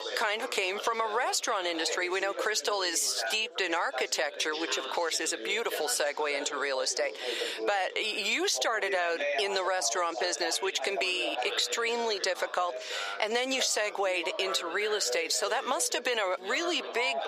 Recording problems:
thin; very; fading below 450 Hz
squashed, flat; heavily, background pumping
background chatter; loud; throughout; 4 voices, 10 dB below the speech

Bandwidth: 15 kHz